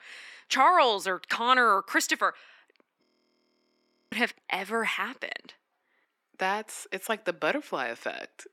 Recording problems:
thin; somewhat; fading below 300 Hz
audio freezing; at 3 s for 1 s

